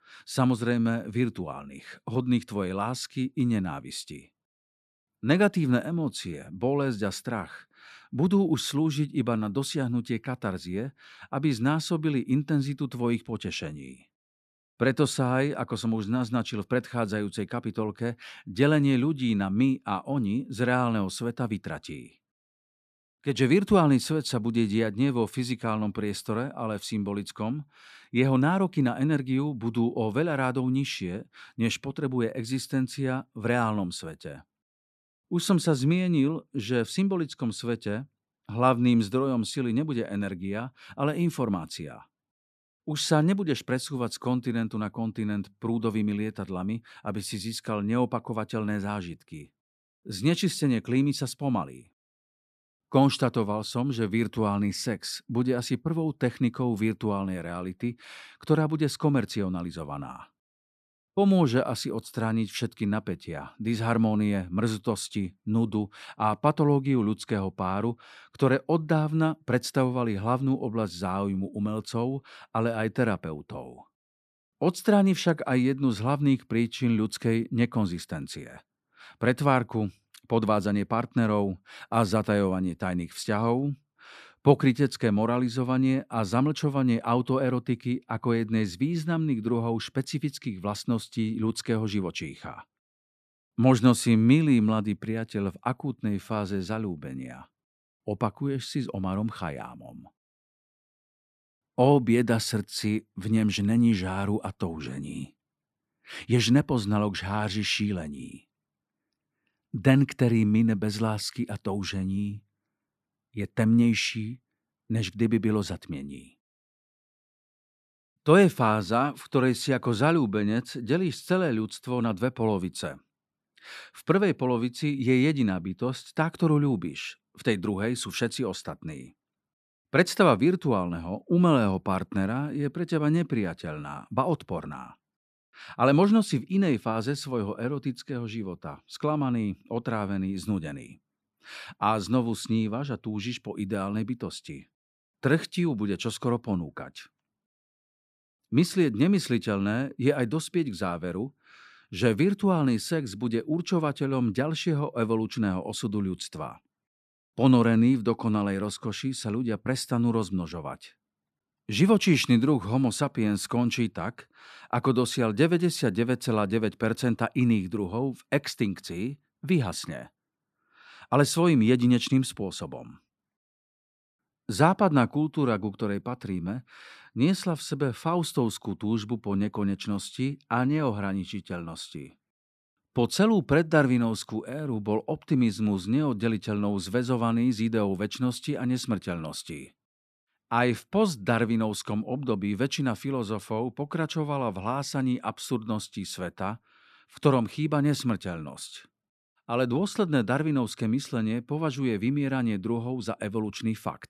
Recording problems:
none

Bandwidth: 14 kHz